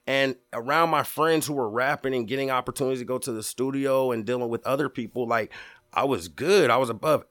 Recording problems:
none

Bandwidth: 18 kHz